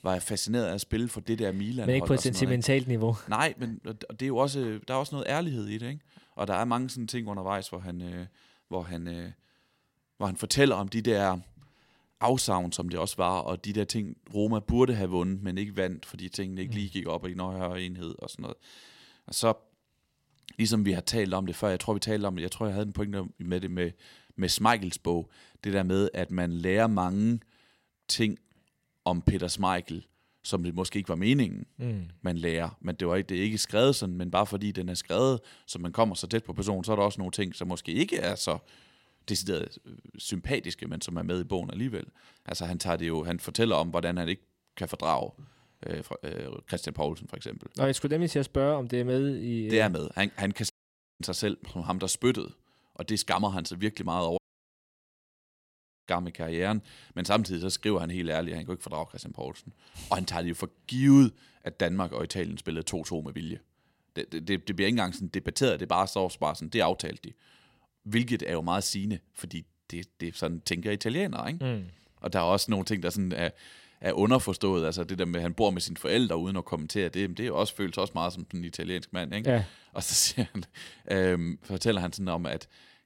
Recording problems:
audio cutting out; at 51 s for 0.5 s and at 54 s for 1.5 s

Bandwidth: 16 kHz